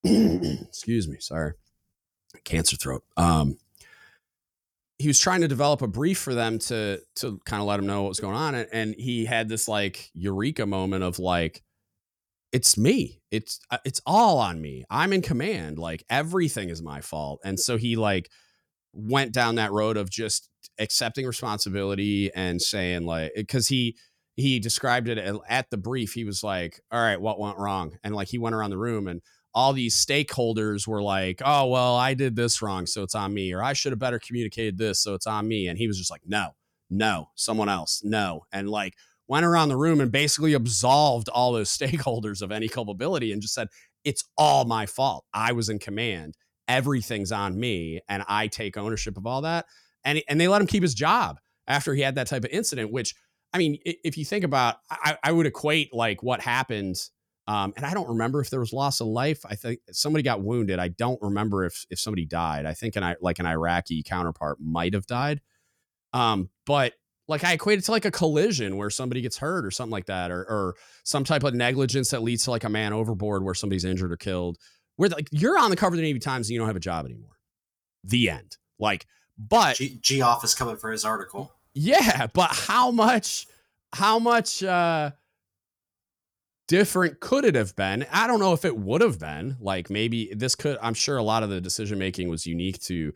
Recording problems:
none

